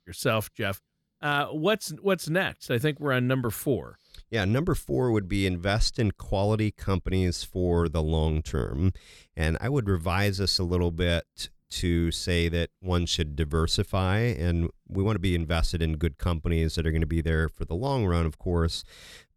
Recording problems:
none

